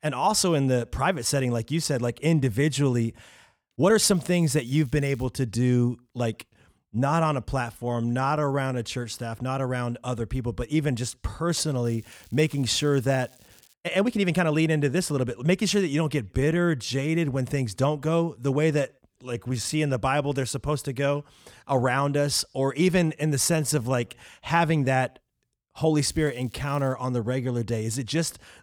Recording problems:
crackling; faint; from 4 to 5.5 s, from 12 to 14 s and at 26 s; 30 dB below the speech
uneven, jittery; strongly; from 3.5 to 24 s

